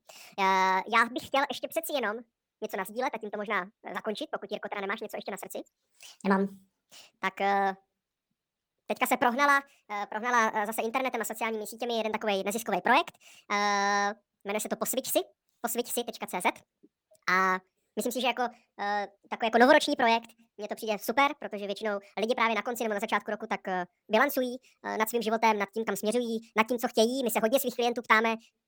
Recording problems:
wrong speed and pitch; too fast and too high; 1.6 times normal speed

